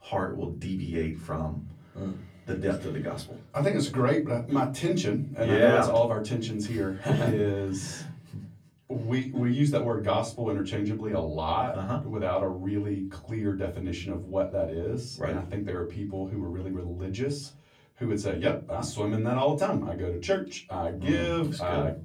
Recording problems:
off-mic speech; far
room echo; very slight; dies away in 0.4 s

